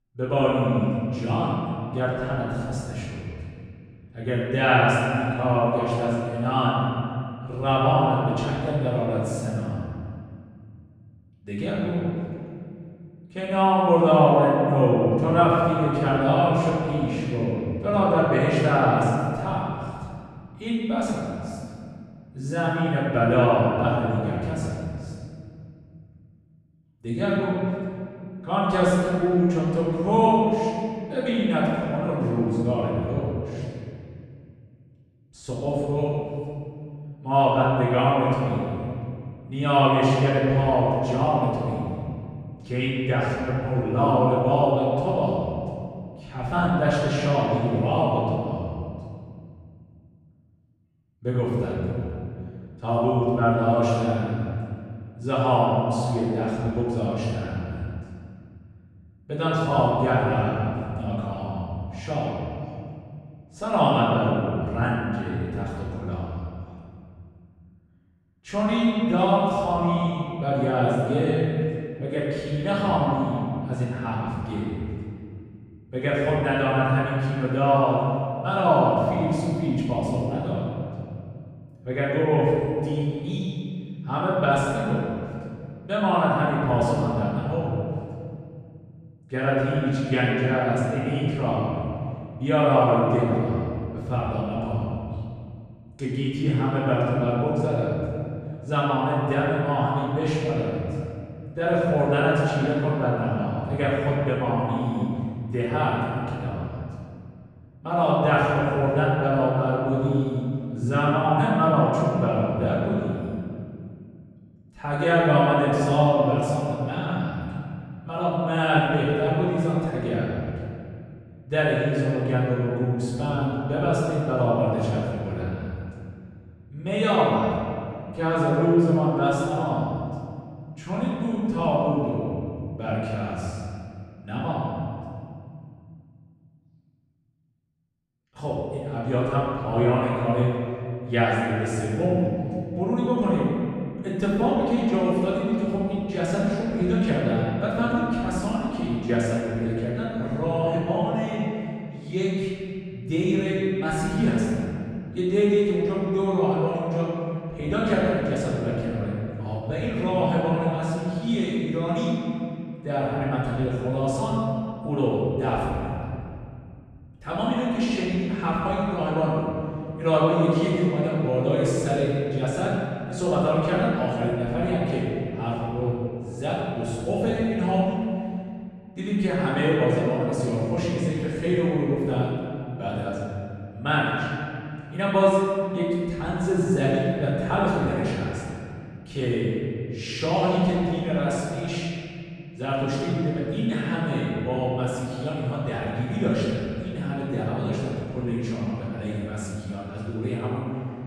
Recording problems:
room echo; strong; dies away in 2.4 s
off-mic speech; far

